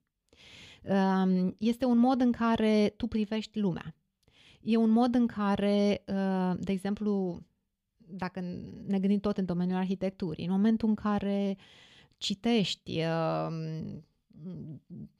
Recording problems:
none

